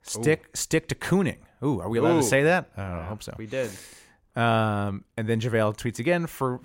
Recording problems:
none

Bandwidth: 16 kHz